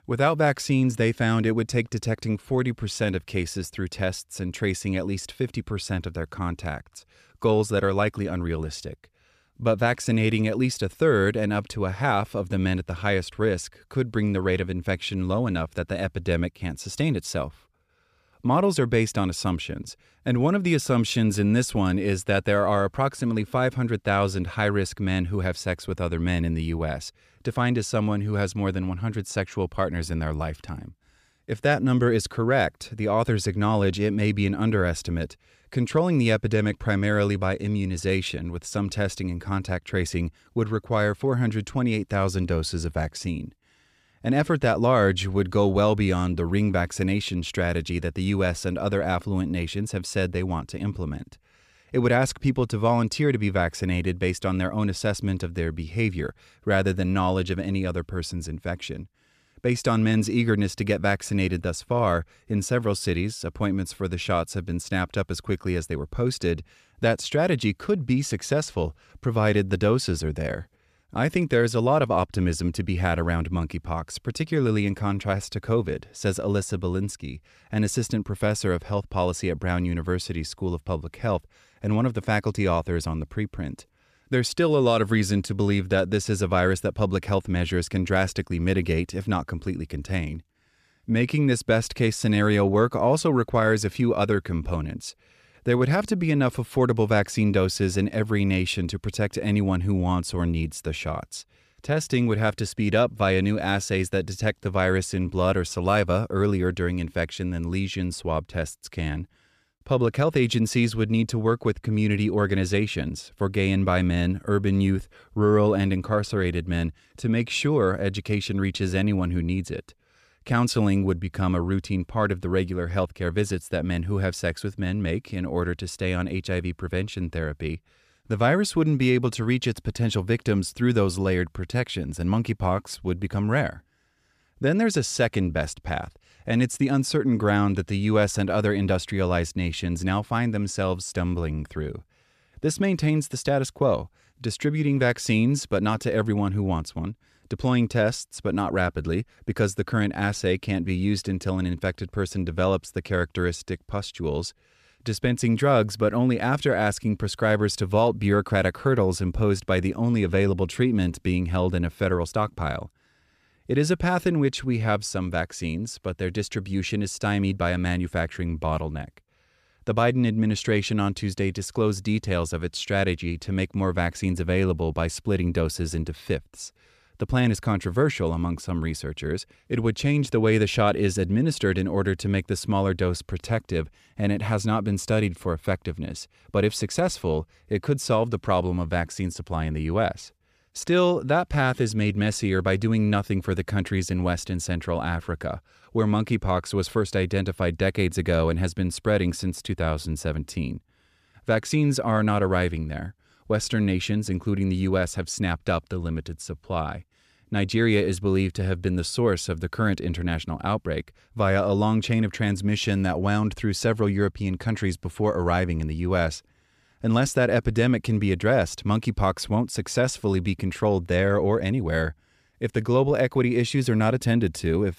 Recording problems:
none

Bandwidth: 14.5 kHz